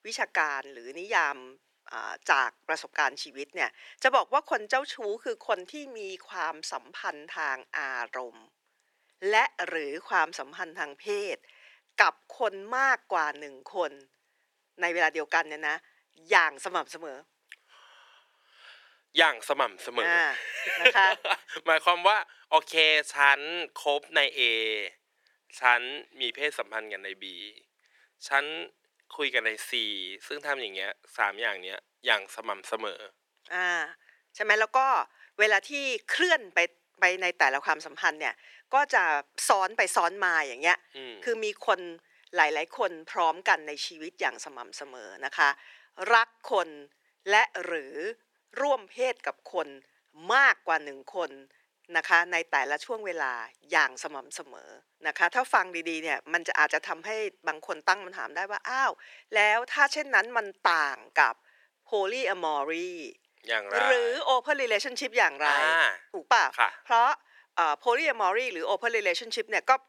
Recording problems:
thin; very; fading below 400 Hz

